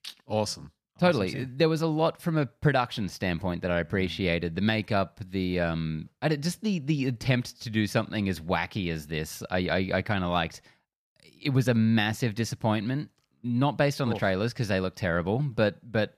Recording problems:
none

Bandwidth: 14.5 kHz